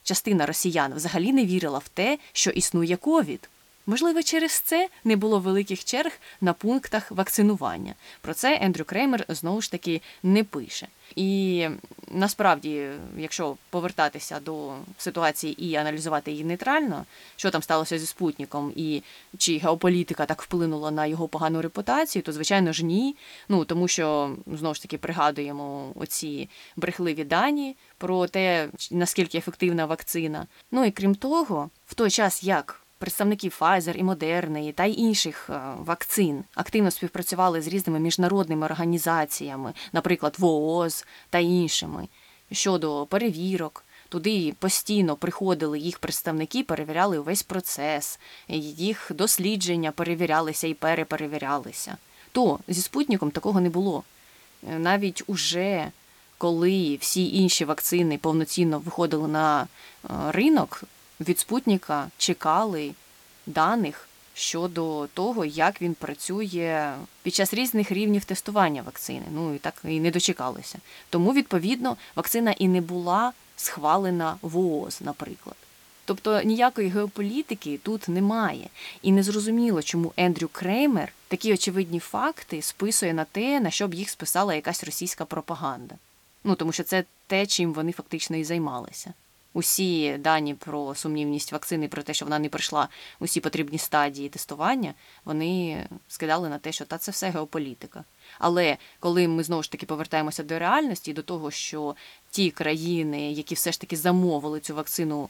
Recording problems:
hiss; faint; throughout; 30 dB below the speech

